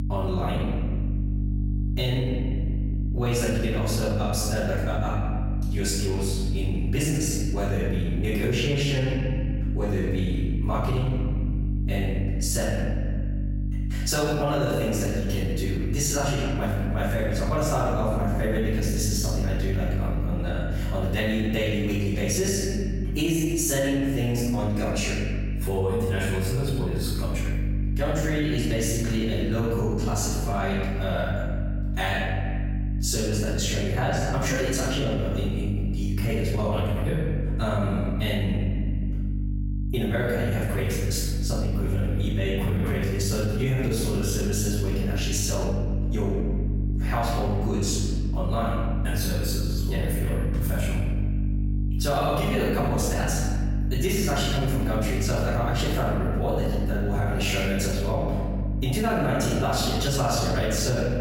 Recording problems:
room echo; strong; dies away in 1.3 s
off-mic speech; far
squashed, flat; somewhat
electrical hum; noticeable; throughout; 50 Hz, 15 dB below the speech

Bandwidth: 16 kHz